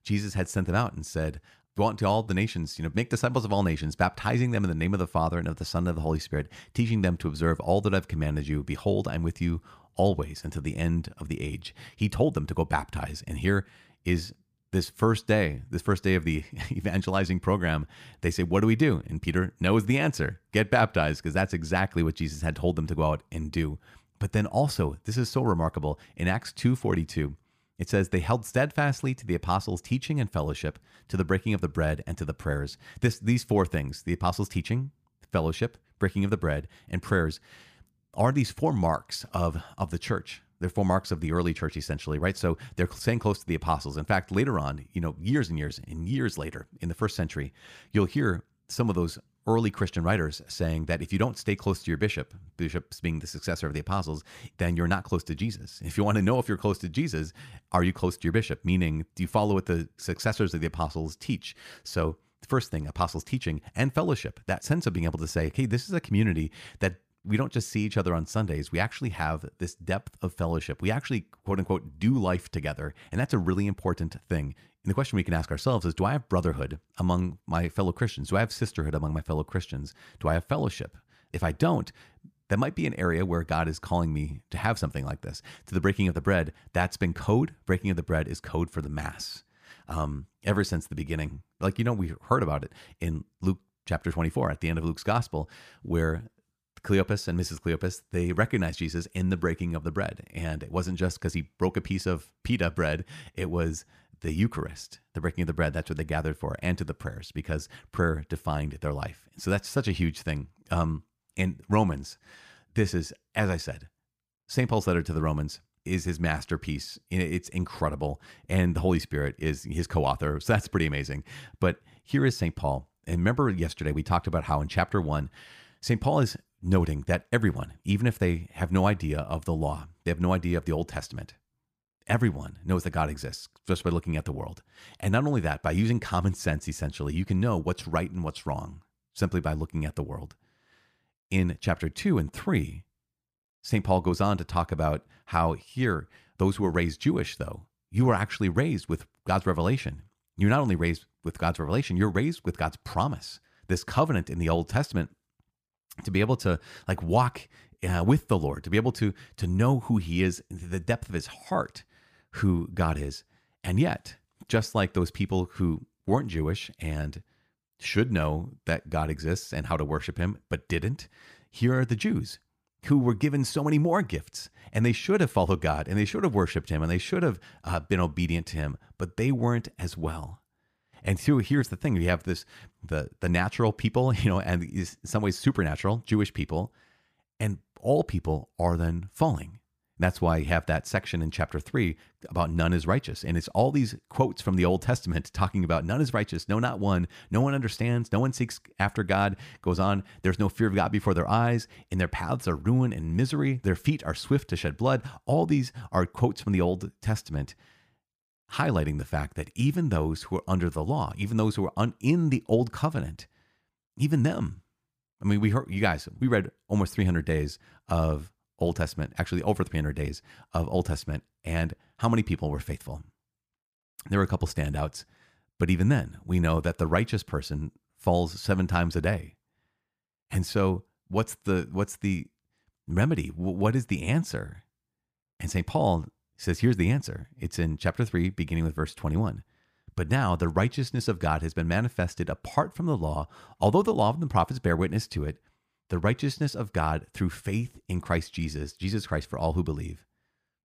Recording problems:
none

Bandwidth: 15 kHz